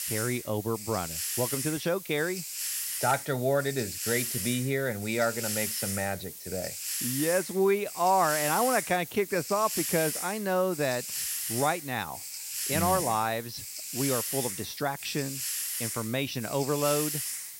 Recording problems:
high frequencies cut off; slight; nothing above 6 kHz
hiss; loud; throughout; 3 dB below the speech

